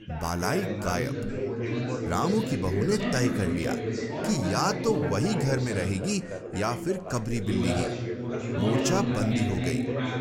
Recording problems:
chatter from many people; loud; throughout; 1 dB below the speech

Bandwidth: 16 kHz